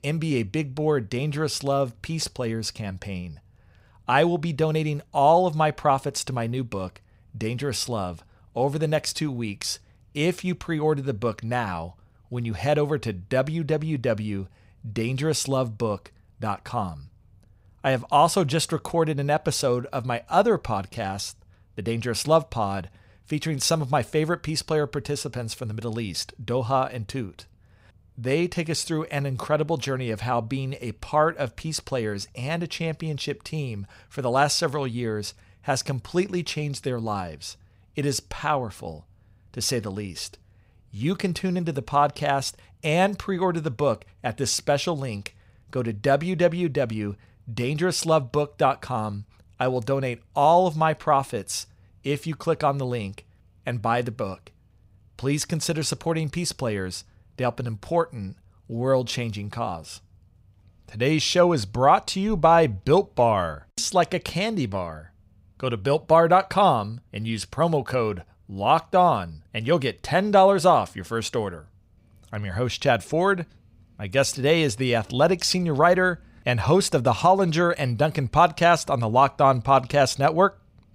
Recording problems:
none

